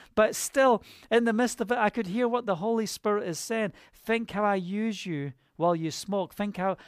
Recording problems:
none

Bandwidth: 15 kHz